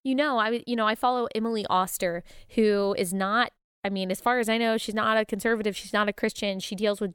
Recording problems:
none

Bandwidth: 17 kHz